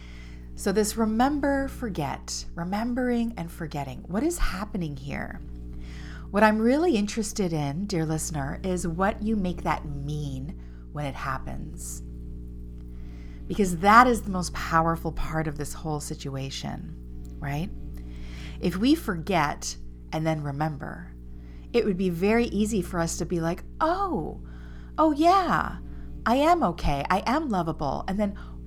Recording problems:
electrical hum; faint; throughout; 60 Hz, 25 dB below the speech

